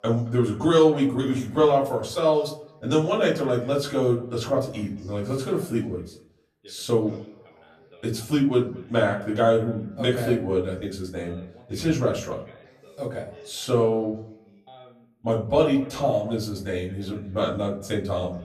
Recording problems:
off-mic speech; far
echo of what is said; faint; throughout; 220 ms later, 20 dB below the speech
room echo; slight; dies away in 0.4 s
background chatter; faint; throughout; 2 voices, 25 dB below the speech

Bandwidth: 14 kHz